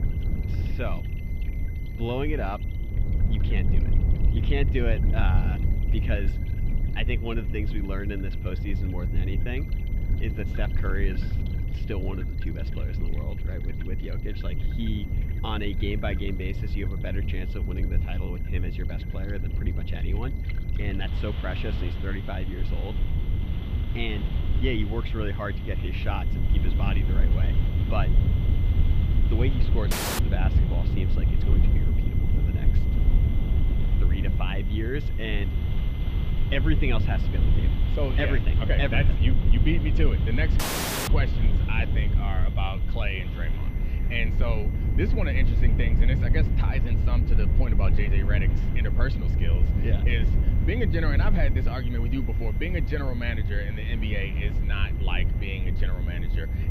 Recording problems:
muffled; very; fading above 3 kHz
low rumble; loud; throughout; 7 dB below the speech
high-pitched whine; noticeable; throughout; 2 kHz, 20 dB below the speech
rain or running water; noticeable; throughout; 15 dB below the speech
audio cutting out; at 30 s and at 41 s

